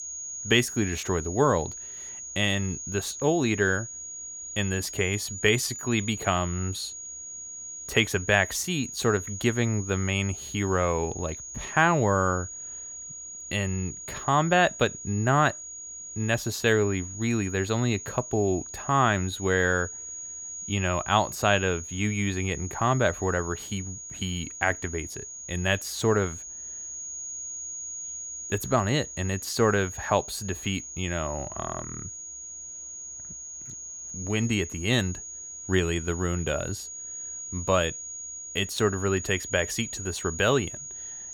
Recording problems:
high-pitched whine; loud; throughout; 6.5 kHz, 9 dB below the speech

